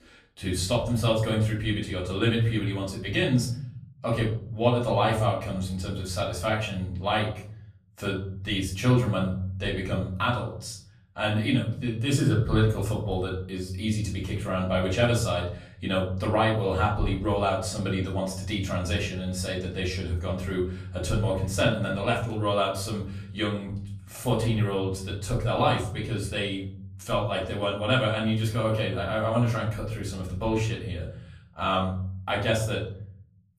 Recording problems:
off-mic speech; far
room echo; slight; dies away in 0.8 s

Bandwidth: 14.5 kHz